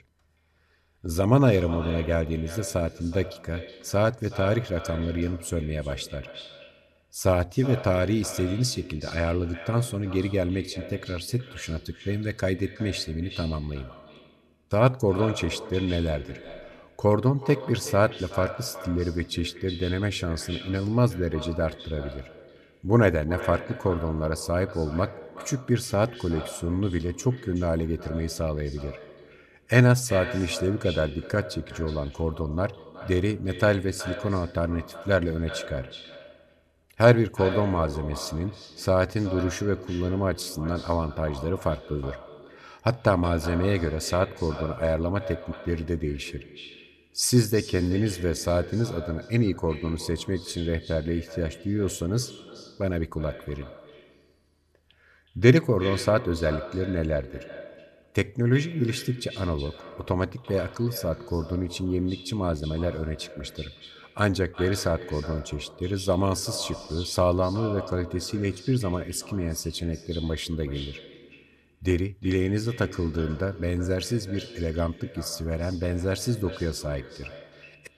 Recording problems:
echo of what is said; noticeable; throughout; 370 ms later, 15 dB below the speech

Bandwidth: 13.5 kHz